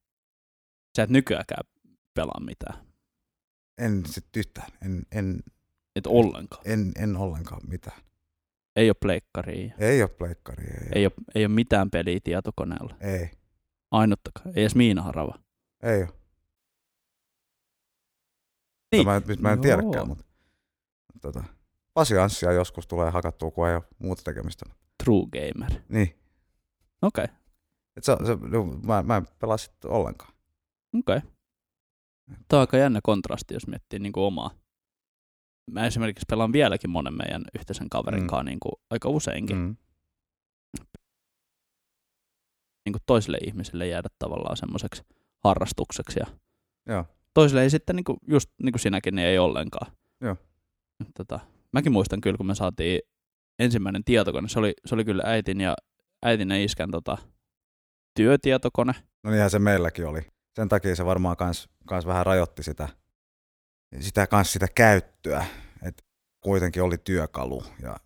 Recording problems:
audio cutting out; at 17 s for 2.5 s, at 41 s for 2 s and at 1:06

